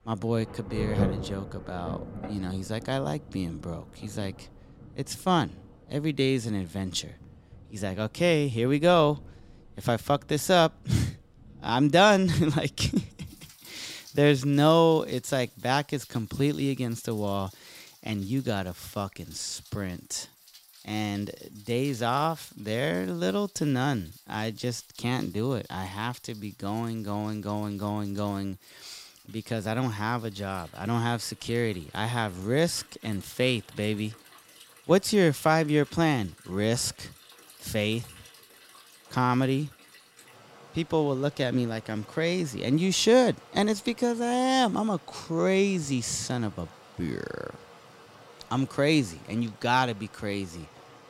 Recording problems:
rain or running water; noticeable; throughout; 20 dB below the speech

